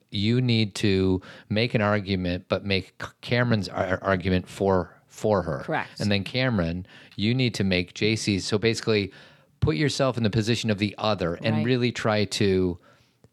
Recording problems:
none

